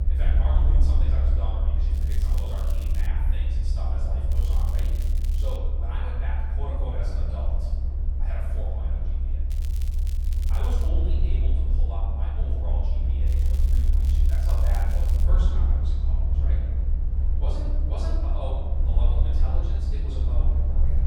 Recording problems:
room echo; strong; dies away in 1.3 s
off-mic speech; far
low rumble; loud; throughout; 3 dB below the speech
crackling; loud; 4 times, first at 2 s; 8 dB below the speech

